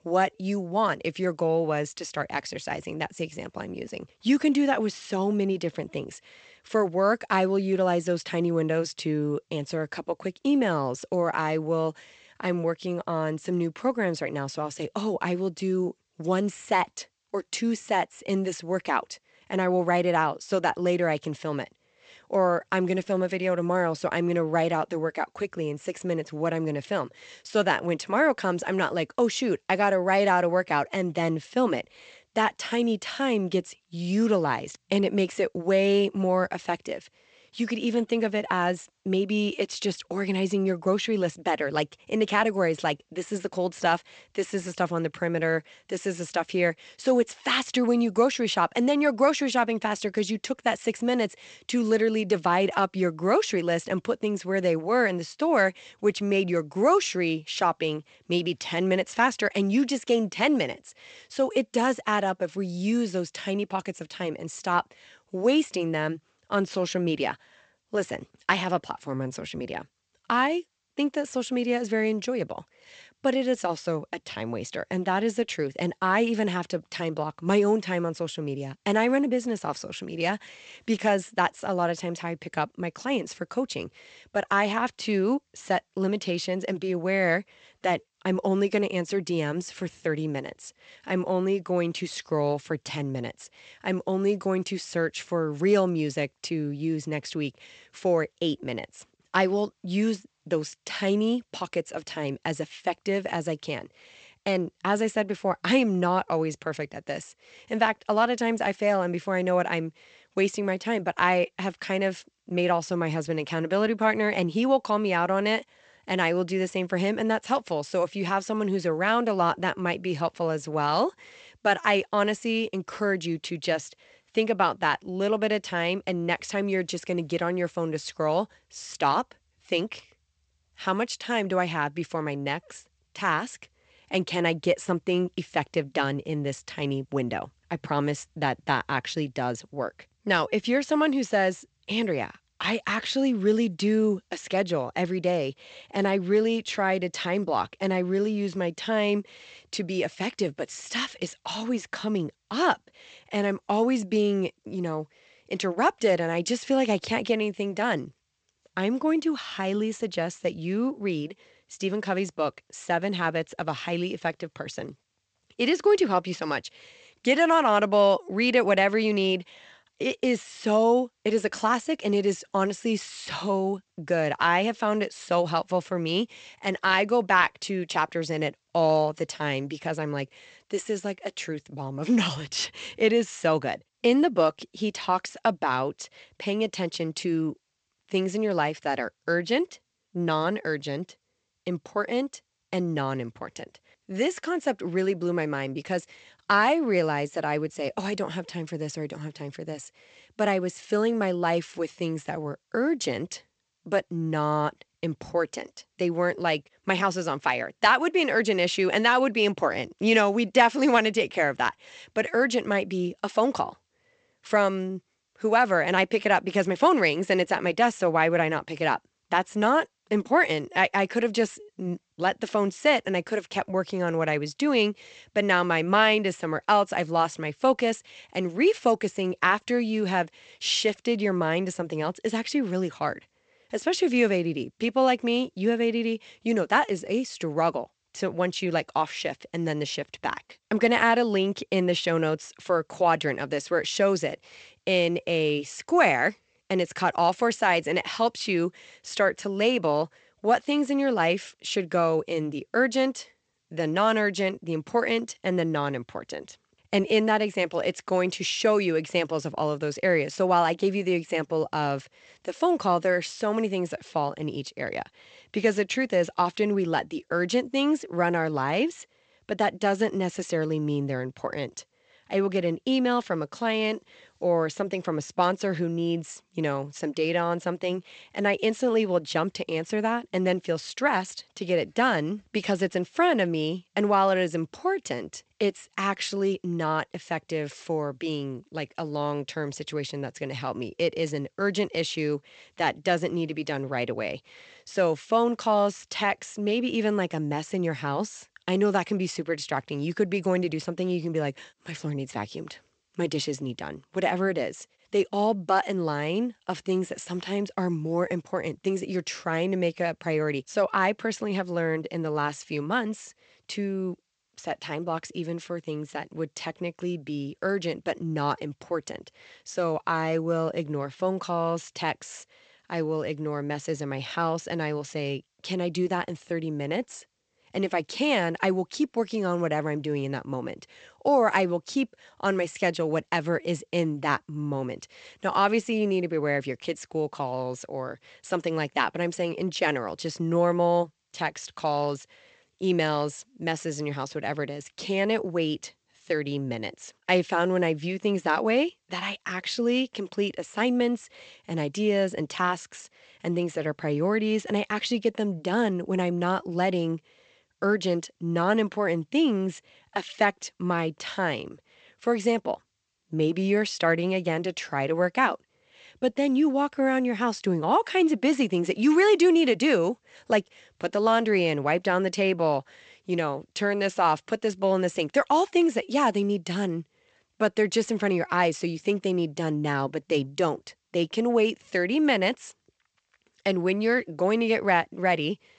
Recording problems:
garbled, watery; slightly; nothing above 8 kHz

